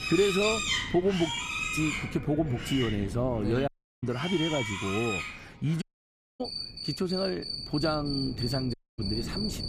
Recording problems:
animal sounds; loud; throughout; 2 dB below the speech
wind noise on the microphone; occasional gusts; 15 dB below the speech
audio cutting out; at 3.5 s, at 6 s for 0.5 s and at 8.5 s

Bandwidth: 15 kHz